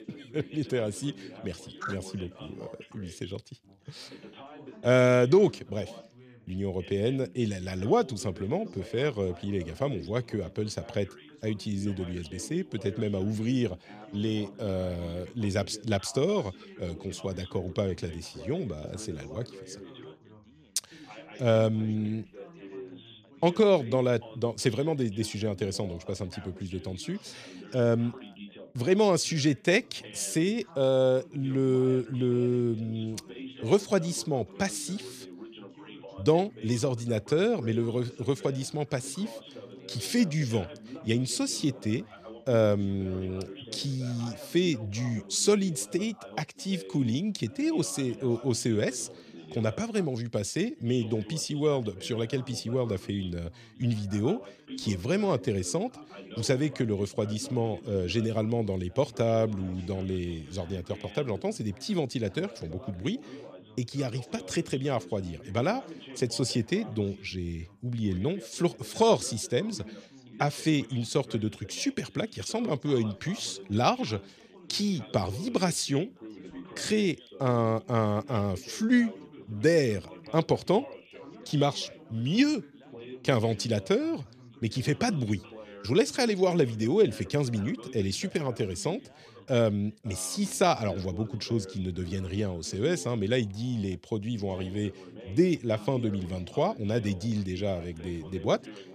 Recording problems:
background chatter; noticeable; throughout; 3 voices, 15 dB below the speech

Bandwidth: 14.5 kHz